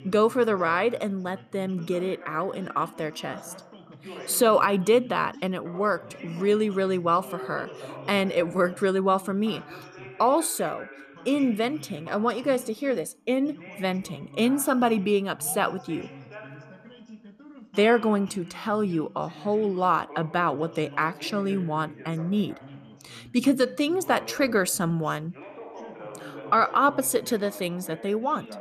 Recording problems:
background chatter; noticeable; throughout; 2 voices, 20 dB below the speech

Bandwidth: 14.5 kHz